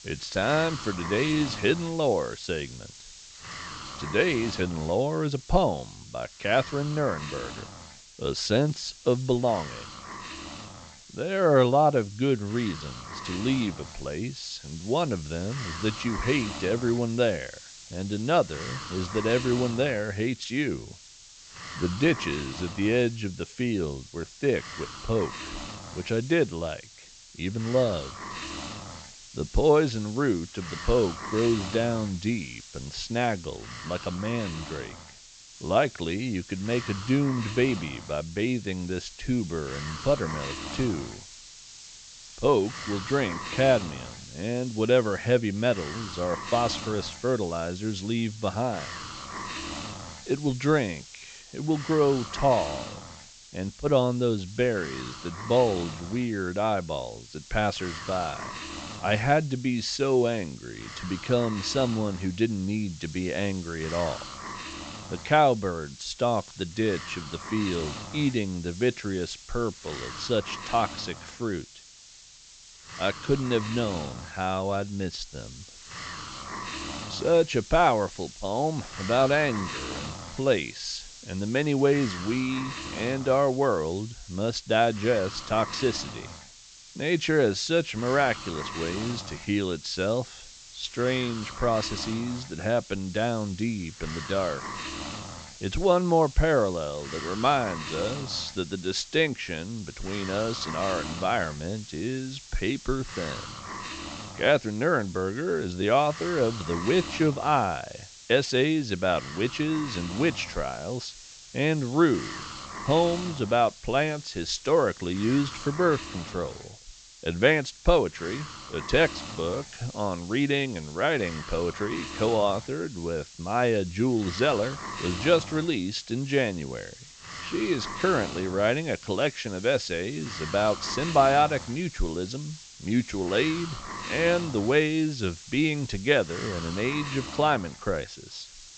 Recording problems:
high frequencies cut off; noticeable; nothing above 8 kHz
hiss; noticeable; throughout; 15 dB below the speech

